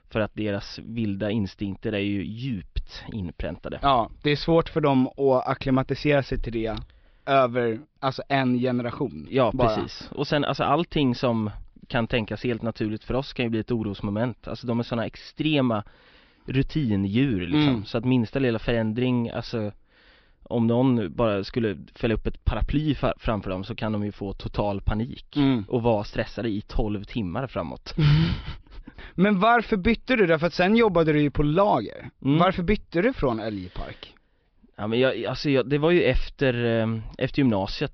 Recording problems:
high frequencies cut off; noticeable; nothing above 5.5 kHz

